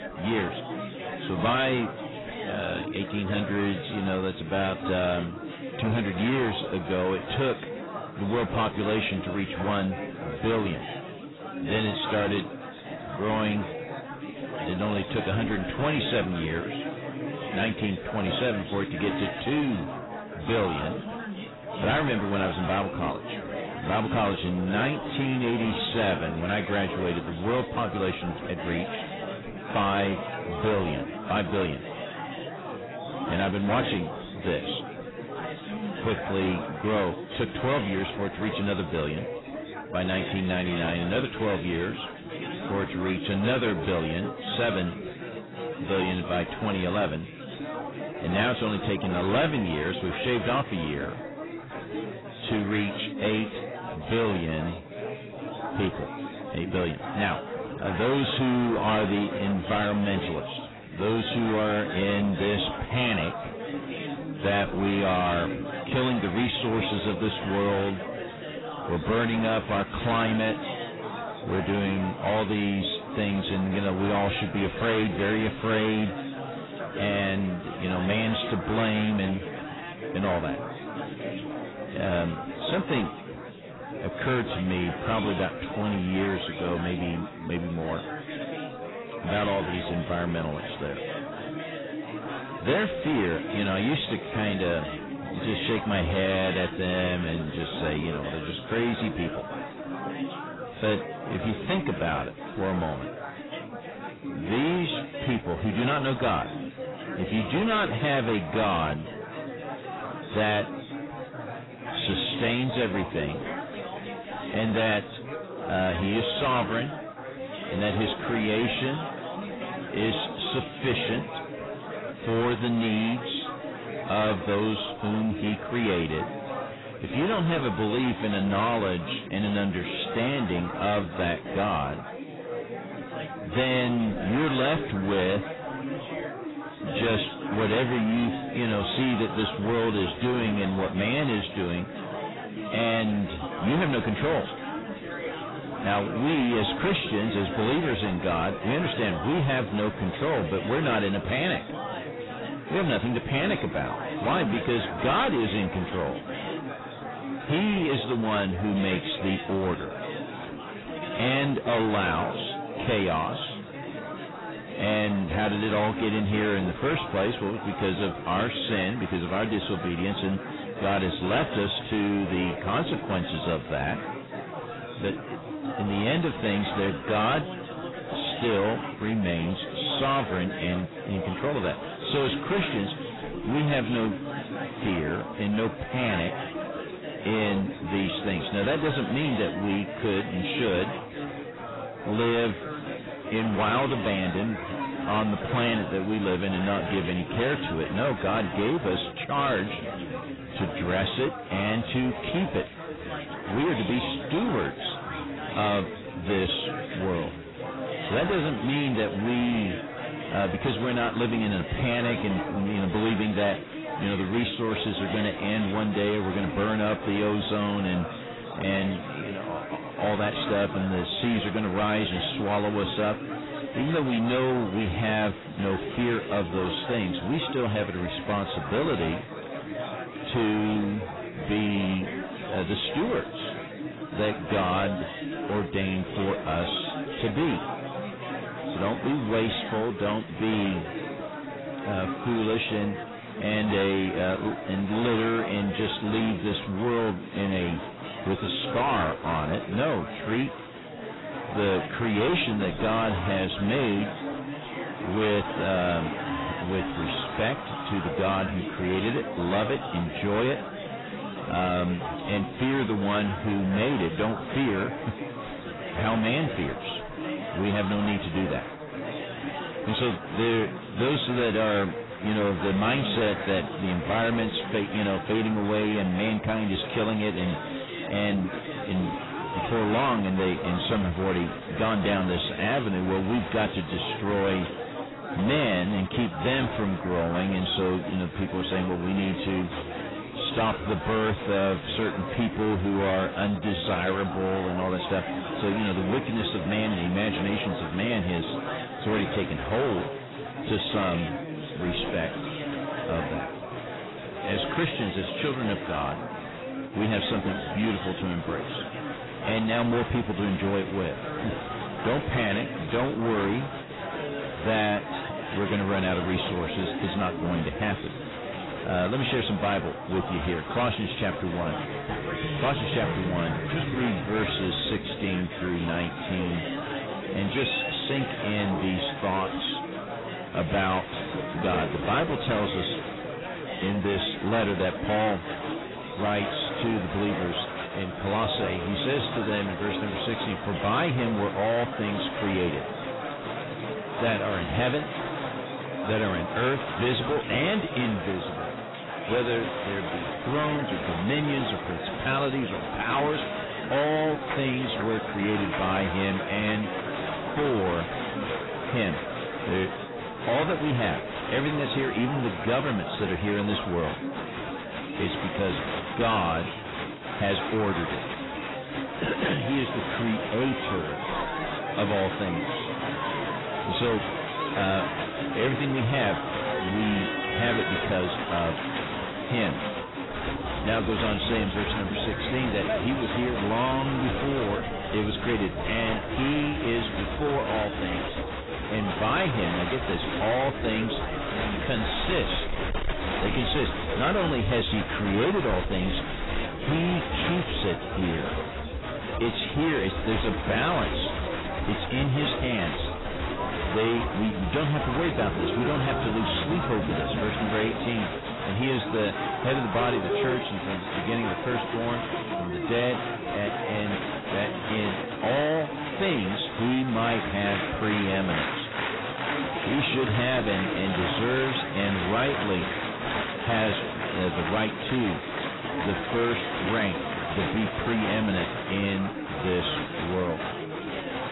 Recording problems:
distortion; heavy; 15% of the sound clipped
garbled, watery; badly; nothing above 4 kHz
chatter from many people; loud; throughout; 7 dB below the speech

